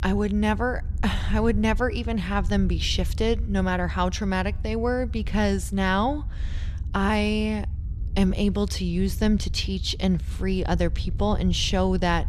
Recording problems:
low rumble; faint; throughout; 20 dB below the speech

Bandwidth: 13.5 kHz